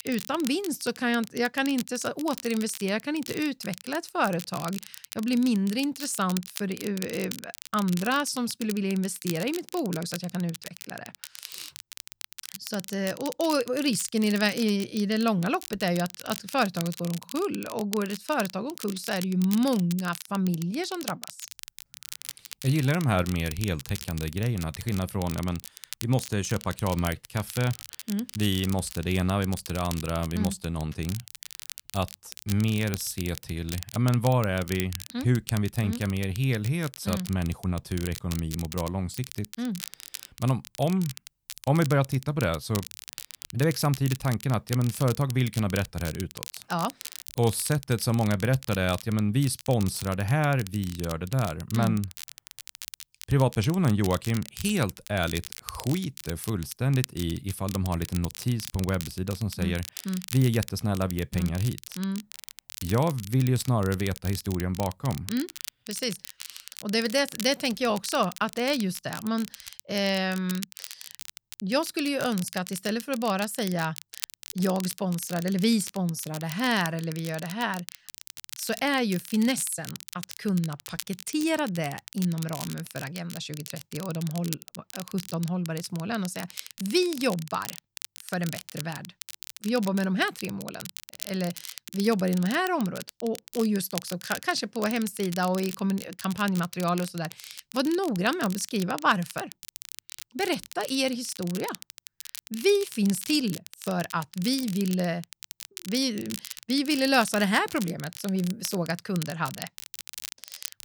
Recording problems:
crackle, like an old record; noticeable; 10 dB below the speech

